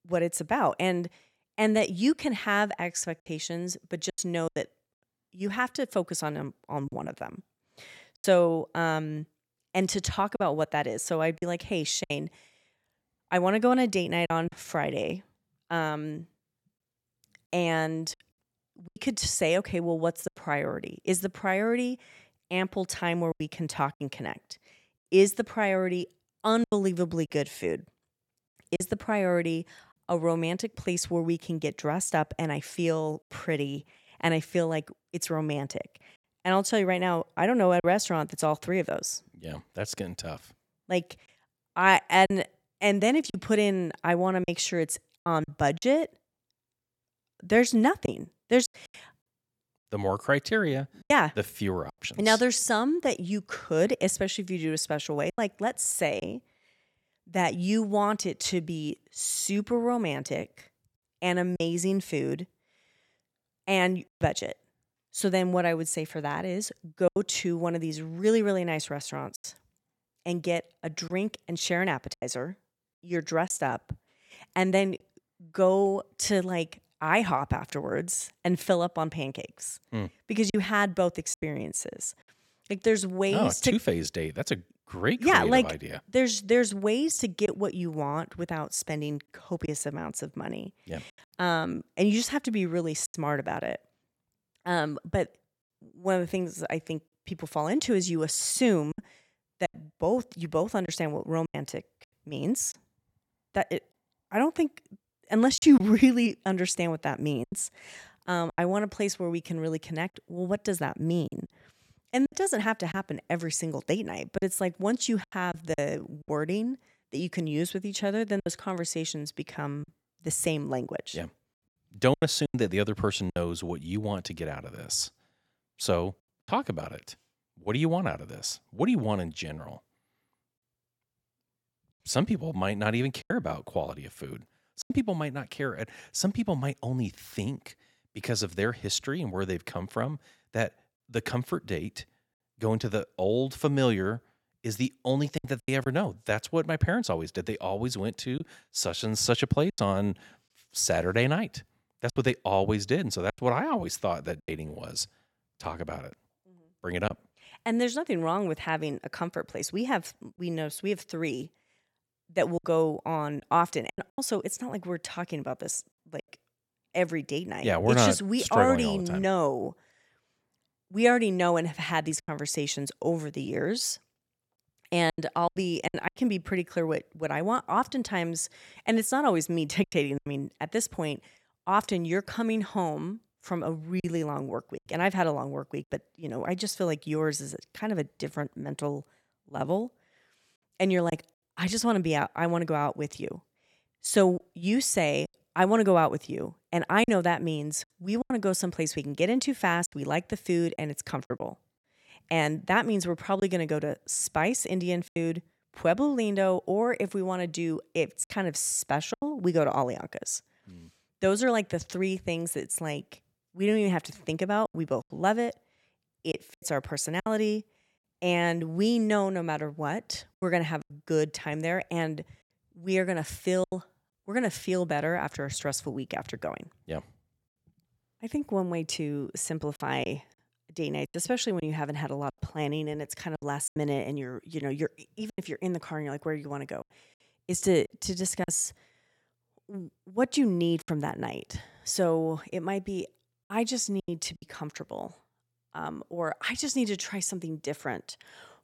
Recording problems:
choppy; occasionally; 4% of the speech affected

